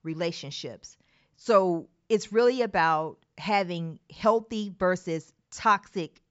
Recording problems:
high frequencies cut off; noticeable; nothing above 8 kHz

